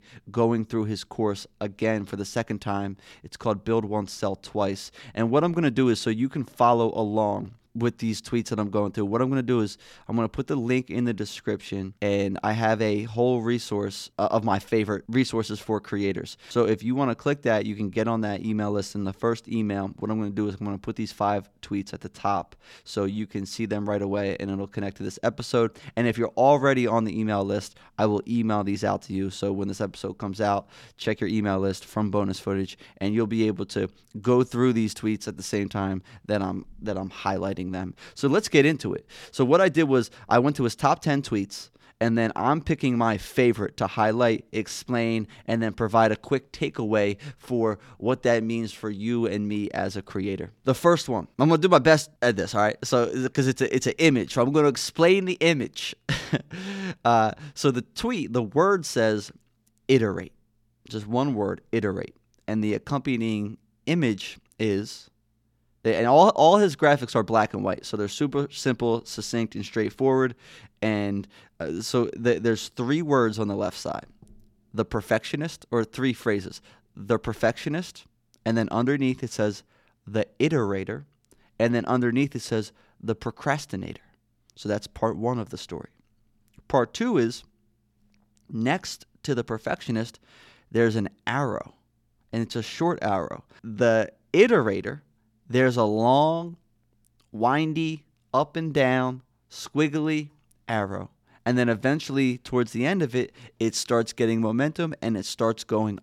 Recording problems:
none

